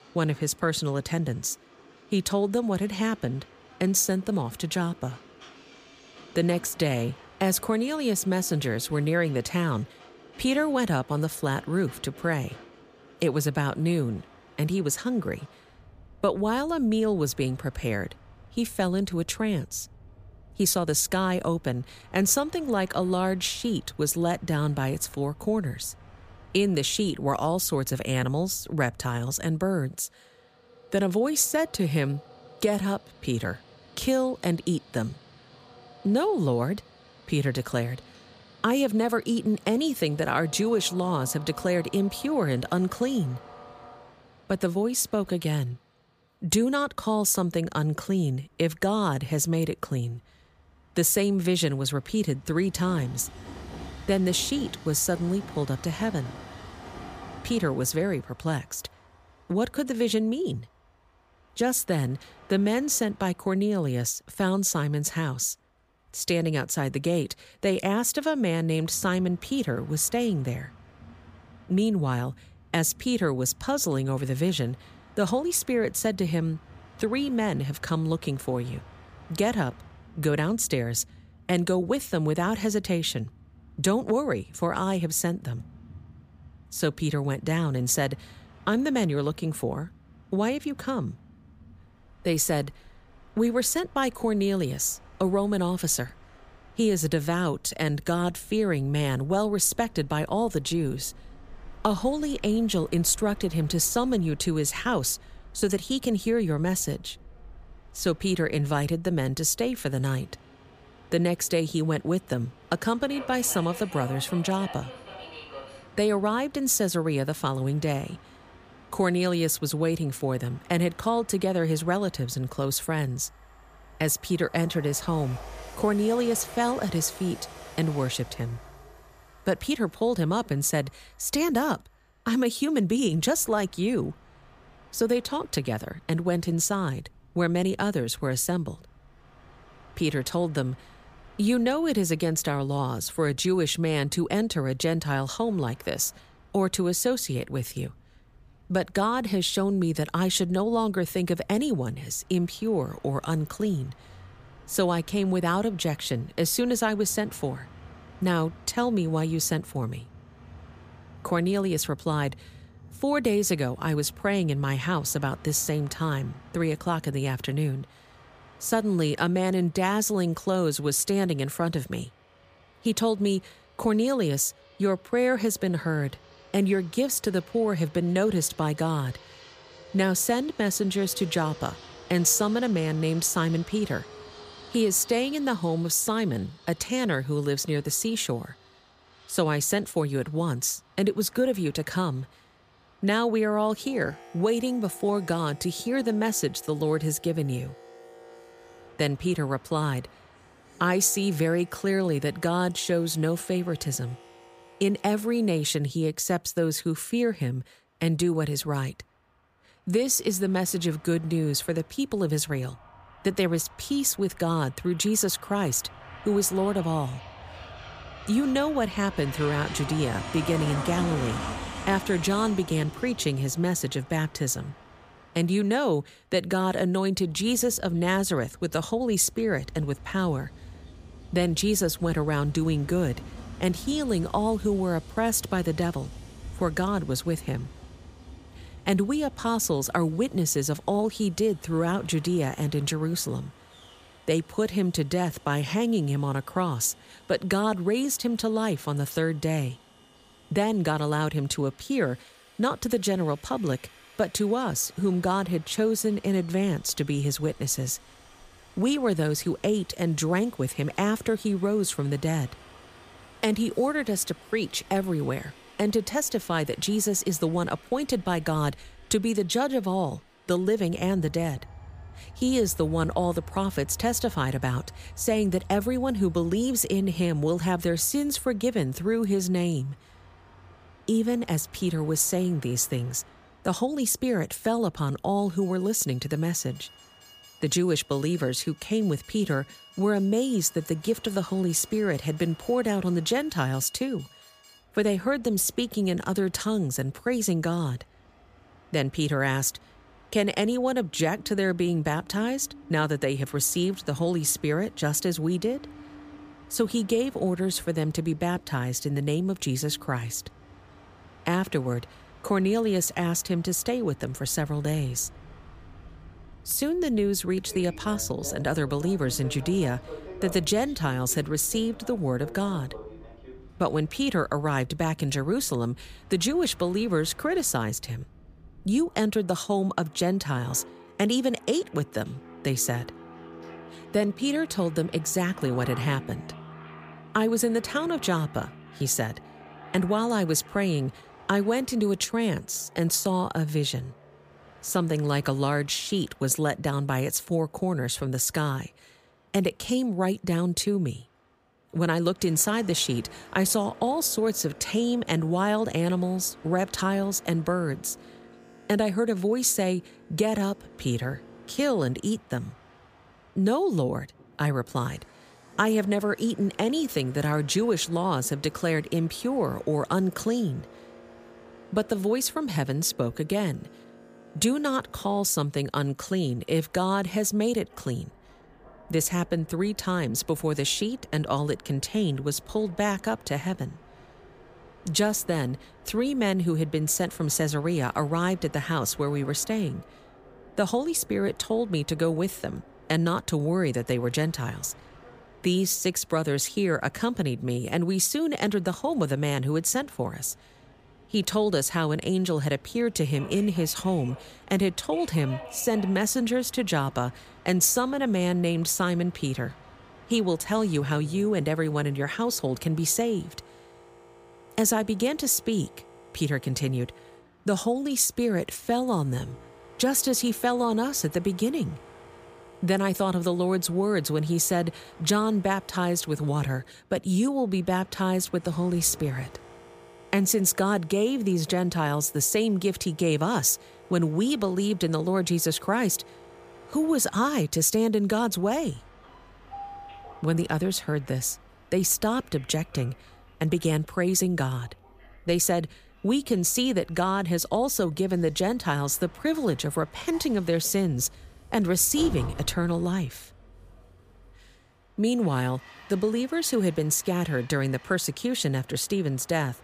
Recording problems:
train or aircraft noise; faint; throughout; 20 dB below the speech

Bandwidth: 15 kHz